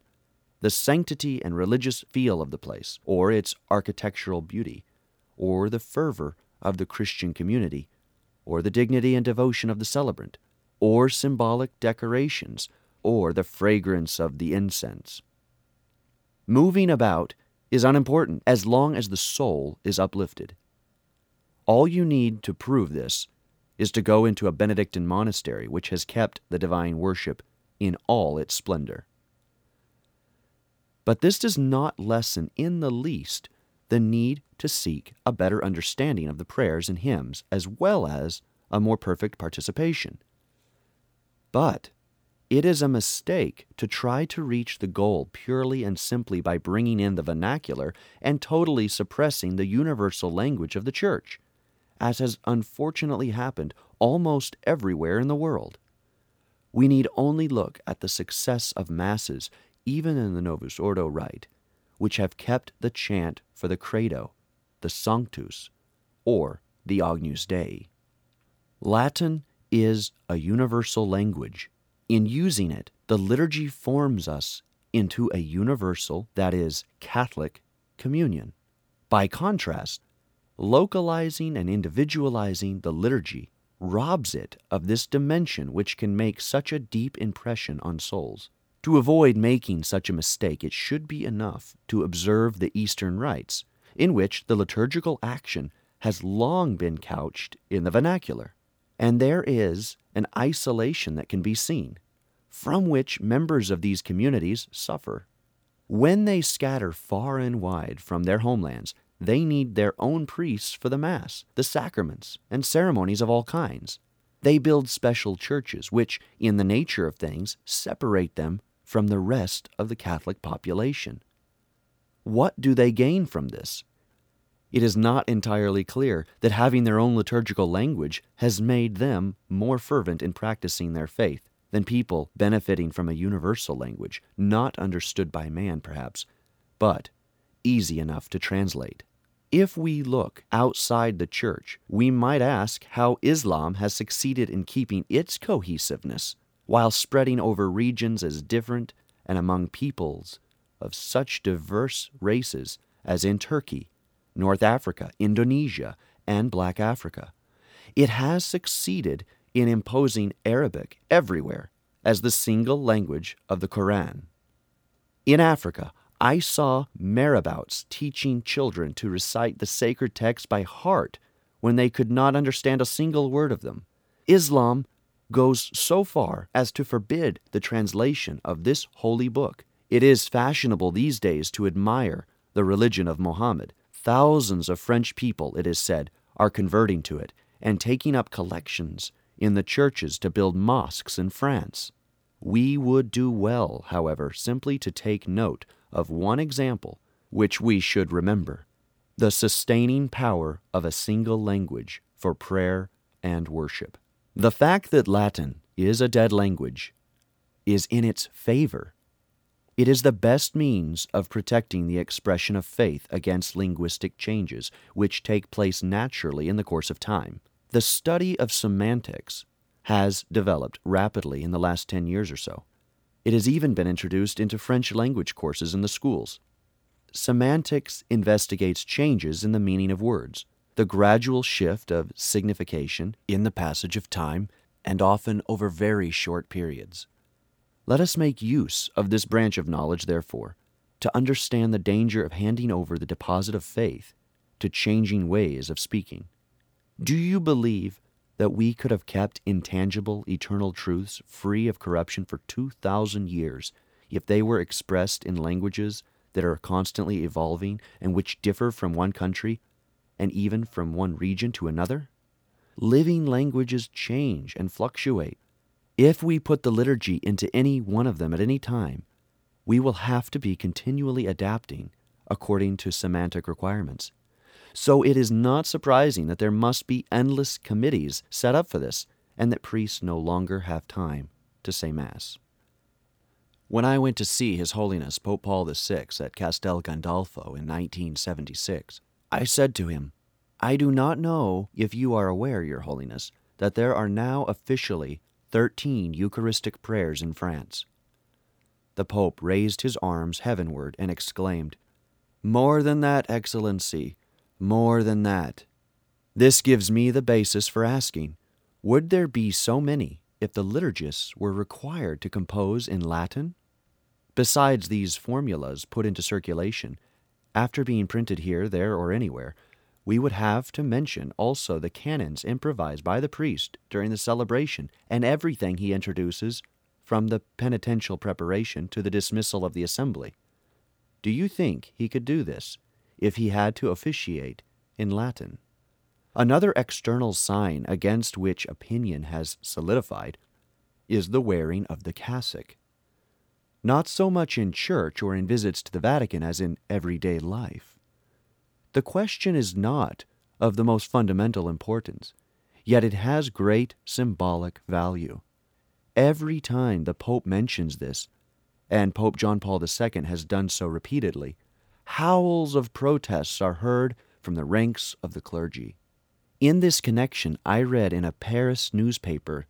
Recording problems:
none

